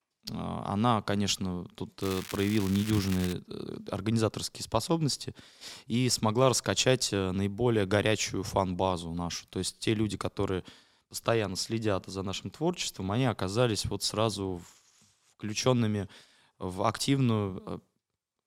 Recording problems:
crackling; noticeable; from 2 to 3.5 s; 10 dB below the speech

